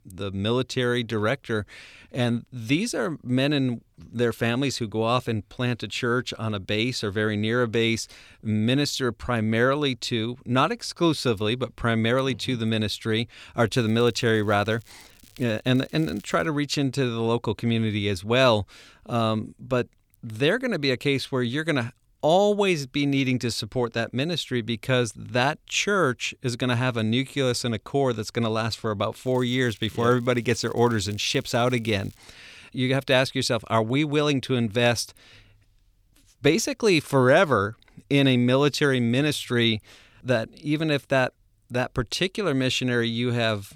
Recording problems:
crackling; faint; from 14 to 16 s and from 29 to 32 s; 30 dB below the speech

